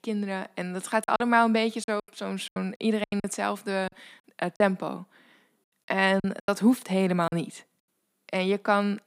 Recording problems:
choppy; very; from 1 to 3 s and from 4 to 6.5 s; 14% of the speech affected

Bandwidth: 15.5 kHz